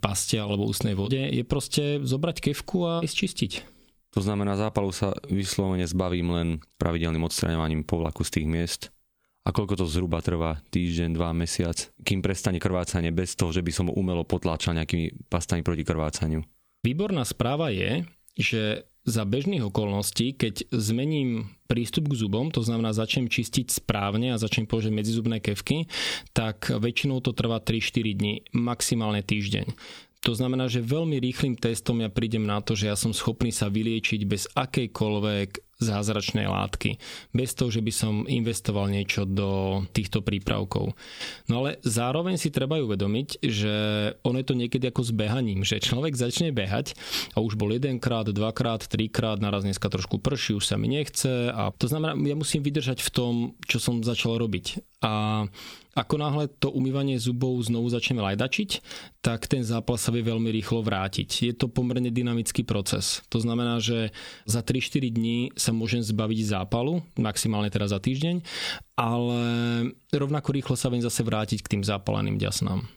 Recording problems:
squashed, flat; somewhat

